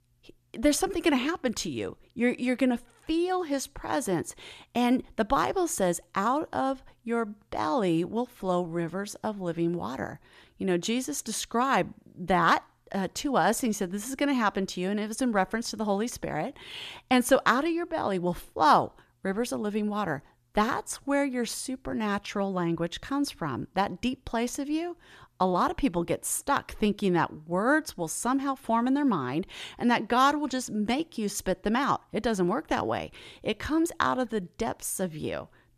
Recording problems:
none

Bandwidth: 14.5 kHz